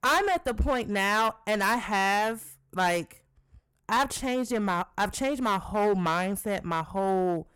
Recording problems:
distortion; heavy; 10% of the sound clipped

